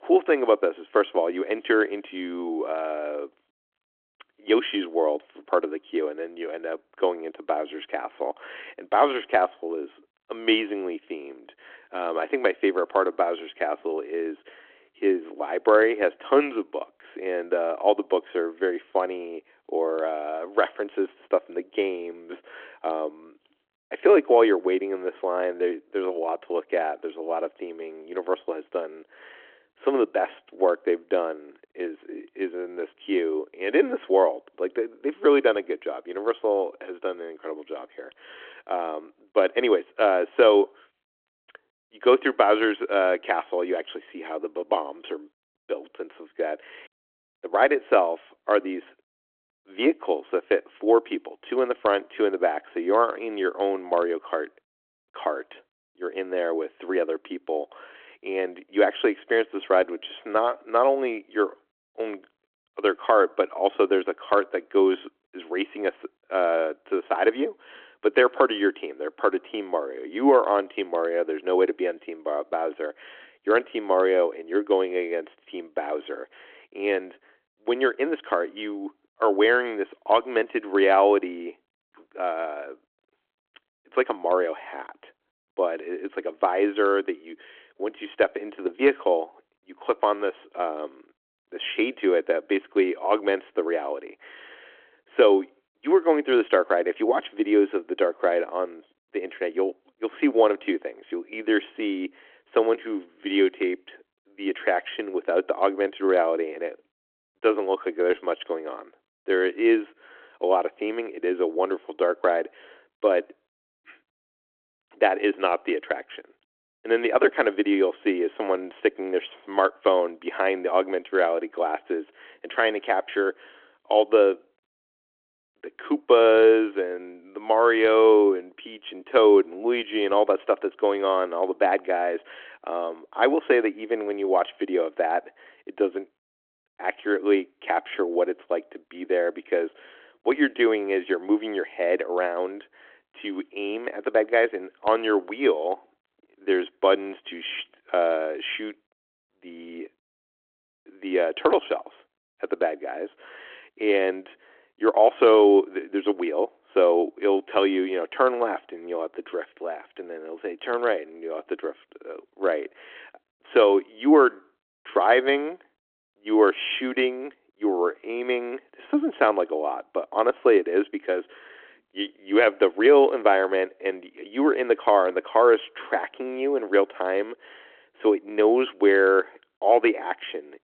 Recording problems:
phone-call audio

